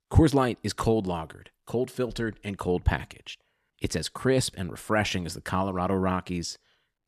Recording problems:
none

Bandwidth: 13.5 kHz